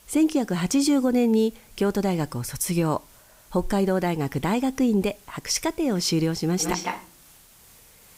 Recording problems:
echo of what is said; strong; from 6.5 s on, mostly in the pauses; 160 ms later, 7 dB below the speech
hiss; faint; throughout; 25 dB below the speech

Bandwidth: 15.5 kHz